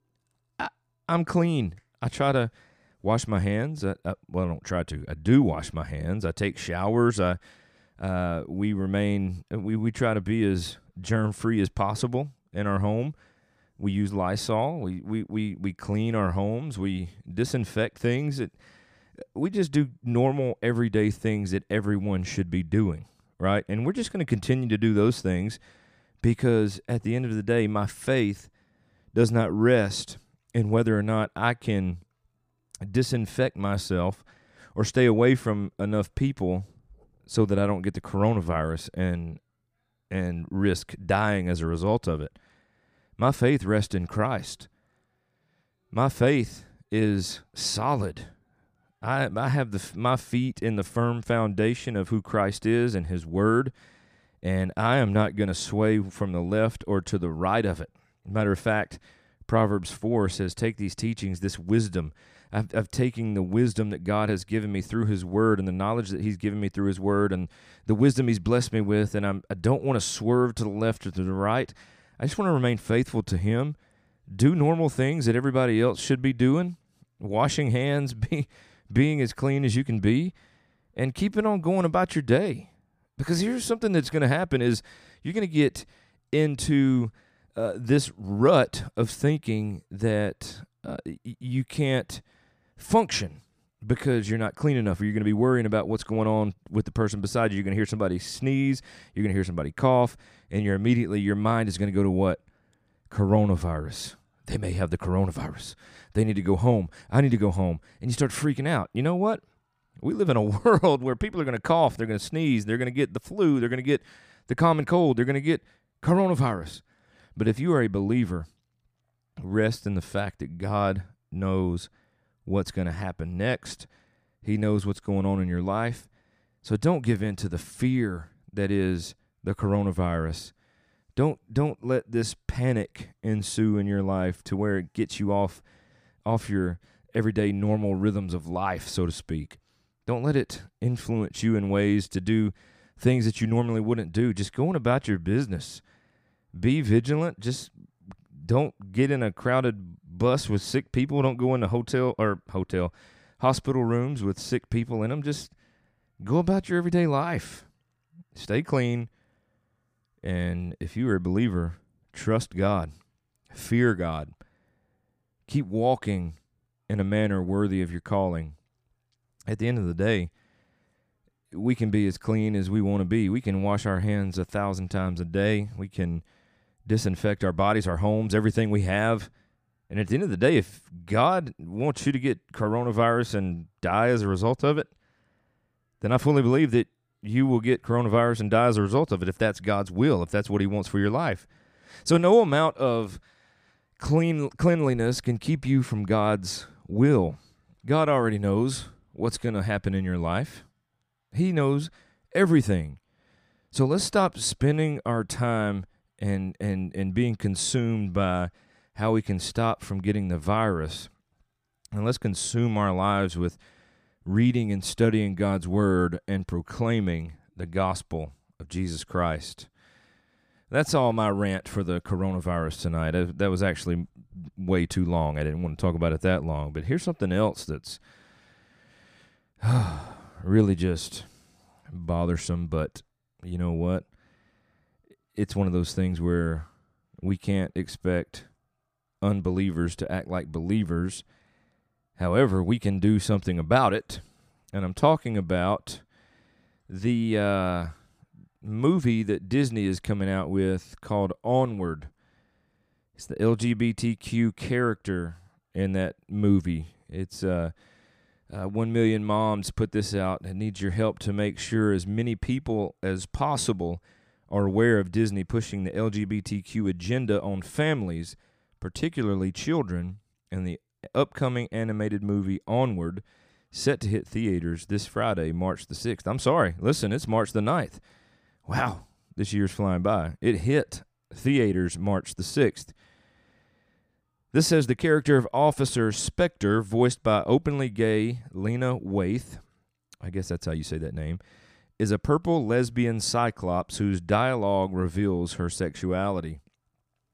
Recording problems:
none

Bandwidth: 15 kHz